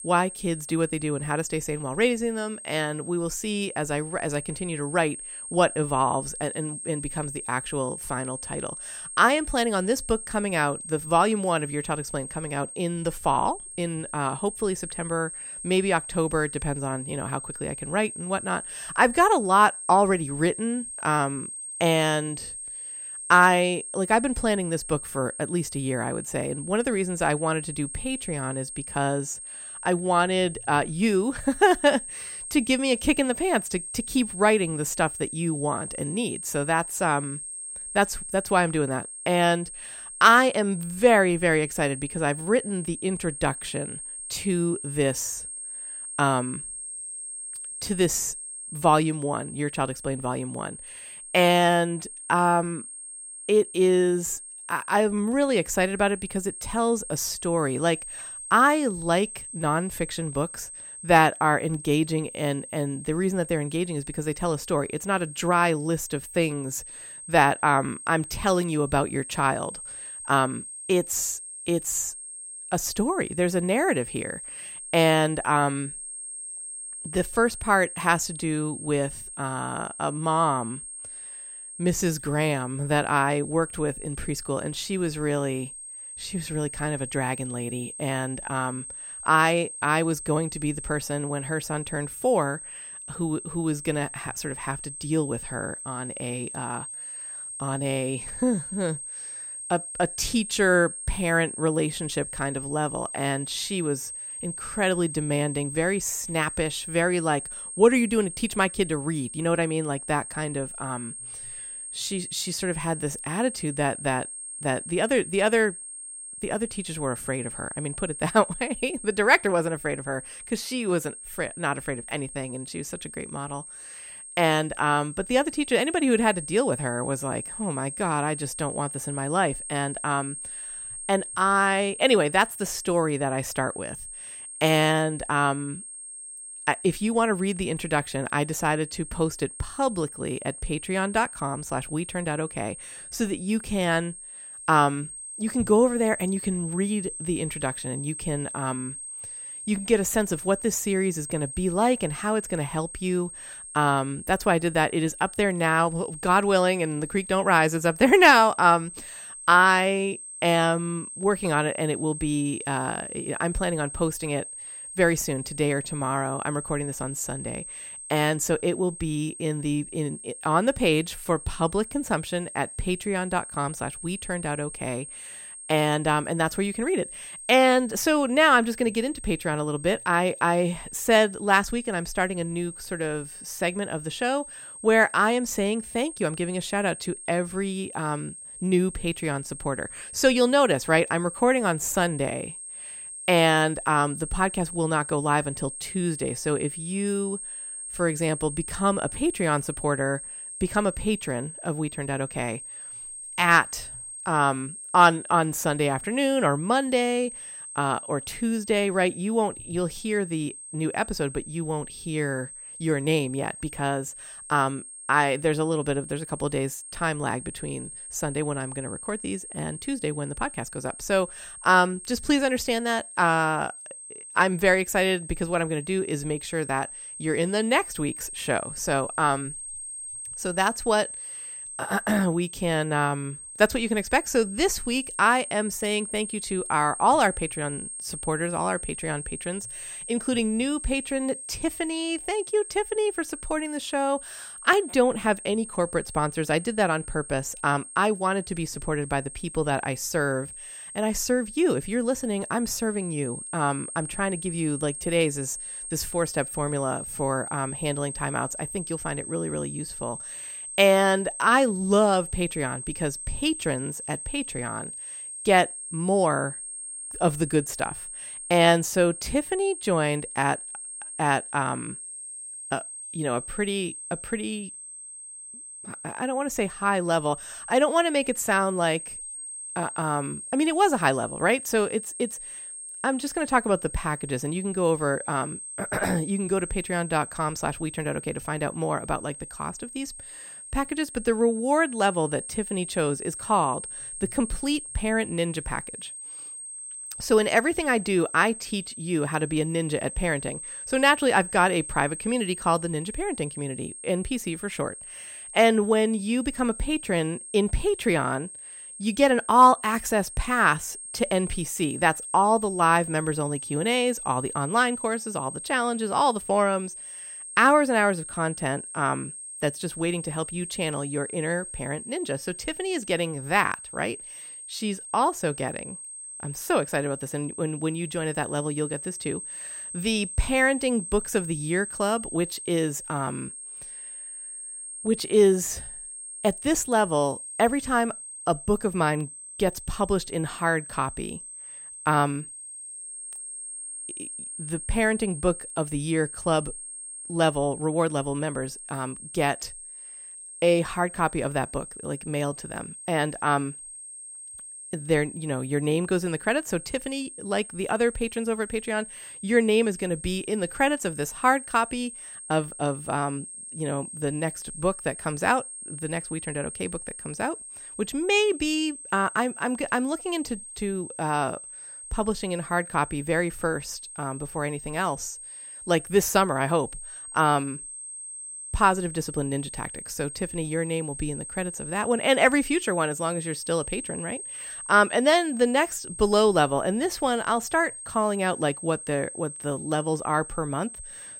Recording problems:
high-pitched whine; noticeable; throughout; 8.5 kHz, 10 dB below the speech

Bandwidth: 16 kHz